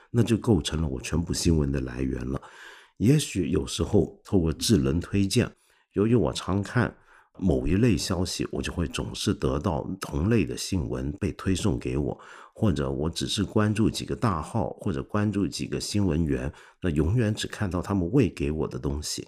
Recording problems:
none

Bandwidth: 15 kHz